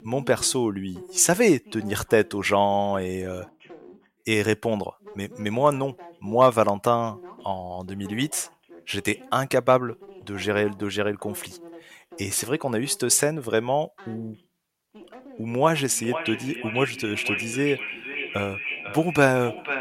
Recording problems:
echo of what is said; strong; from 15 s on; 500 ms later, 6 dB below the speech
voice in the background; faint; throughout; 25 dB below the speech

